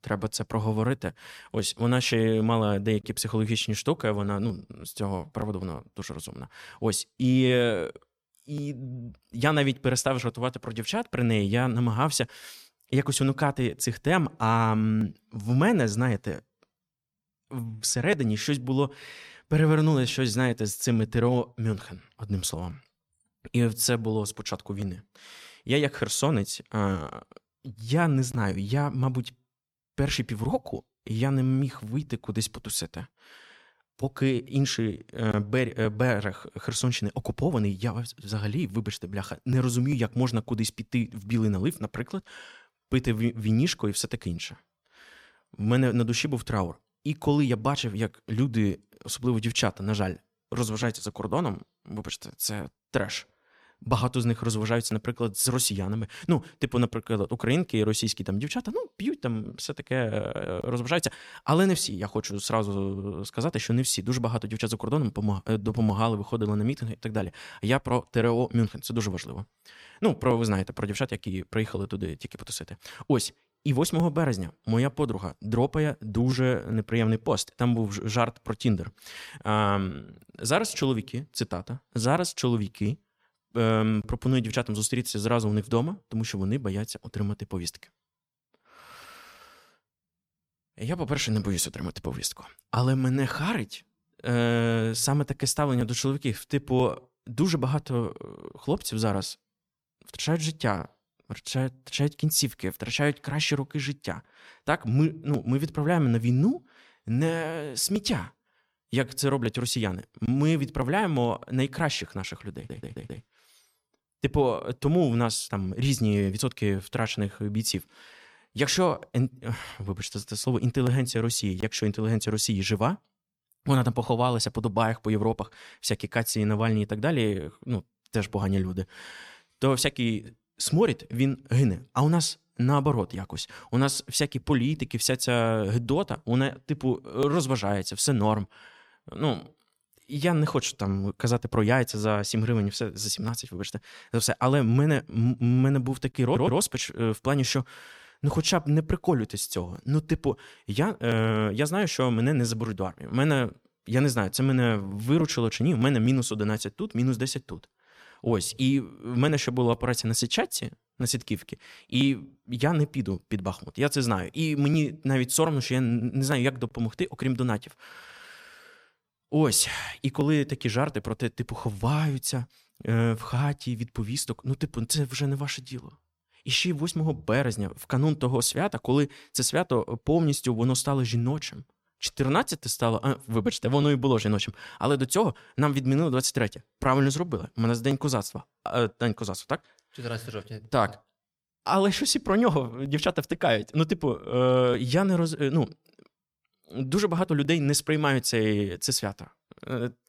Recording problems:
audio stuttering; at 1:53 and at 2:26

